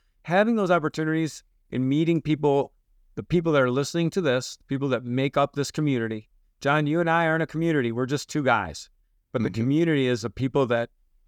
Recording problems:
none

